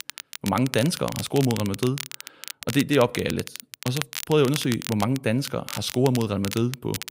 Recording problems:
crackle, like an old record; loud; 10 dB below the speech

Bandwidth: 15.5 kHz